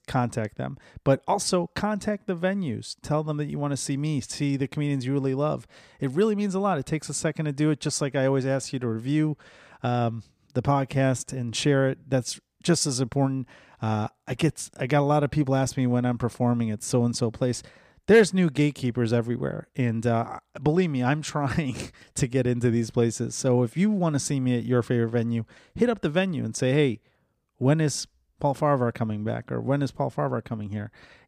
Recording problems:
none

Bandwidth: 15 kHz